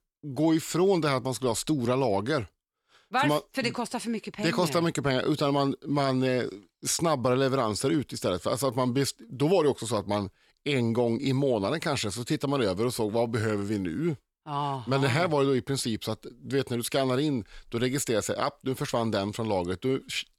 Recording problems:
none

